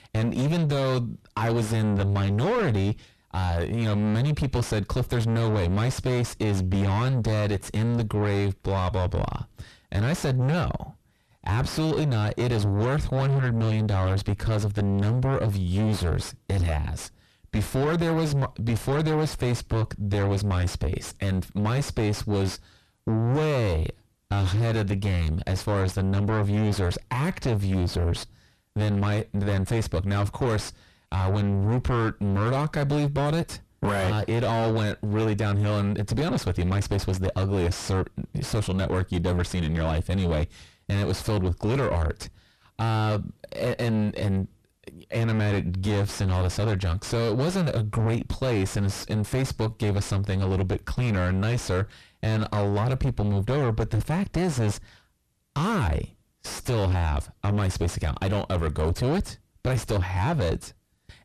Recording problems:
distortion; heavy; 3 dB below the speech

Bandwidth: 13.5 kHz